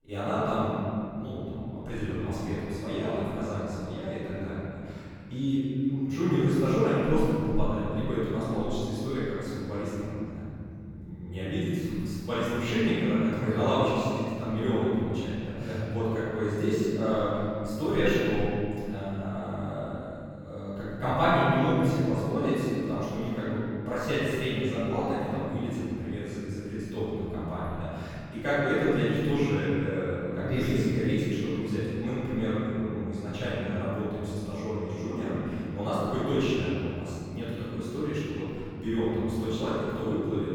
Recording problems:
room echo; strong; dies away in 2.6 s
off-mic speech; far

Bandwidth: 18.5 kHz